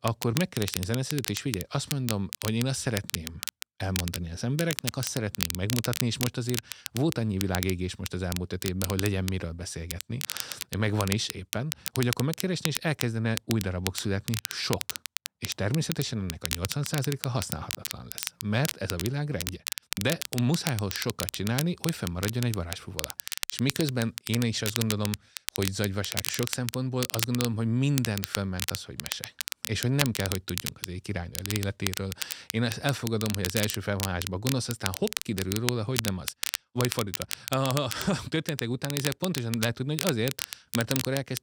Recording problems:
crackle, like an old record; loud; 4 dB below the speech

